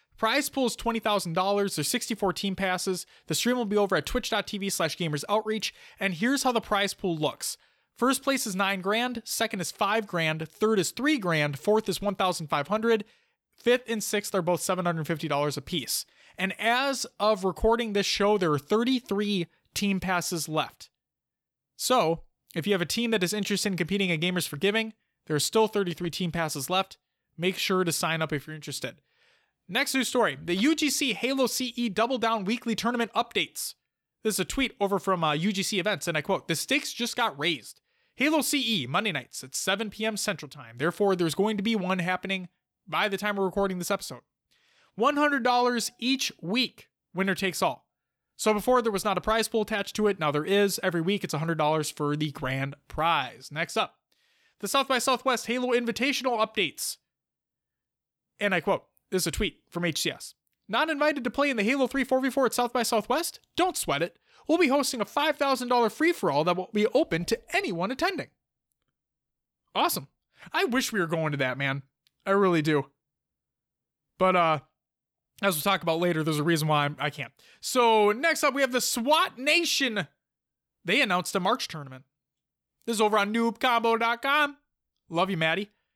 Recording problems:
none

